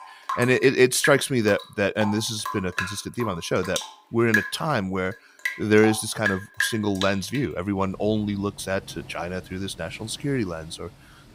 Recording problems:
rain or running water; loud; throughout; 6 dB below the speech

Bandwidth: 15.5 kHz